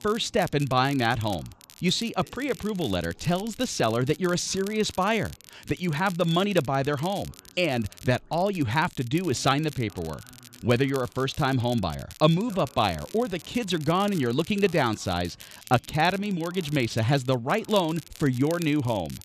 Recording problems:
crackle, like an old record; noticeable; 20 dB below the speech
voice in the background; faint; throughout; 30 dB below the speech

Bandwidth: 14 kHz